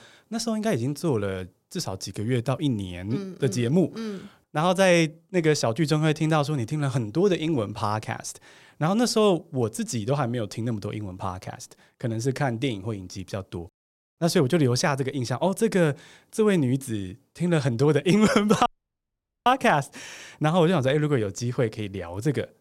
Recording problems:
audio cutting out; at 19 s for 1 s

